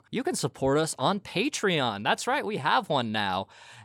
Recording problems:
none

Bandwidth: 18 kHz